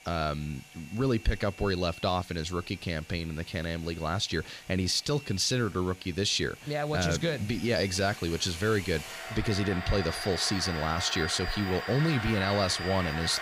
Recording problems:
household noises; loud; throughout; 9 dB below the speech

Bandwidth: 15 kHz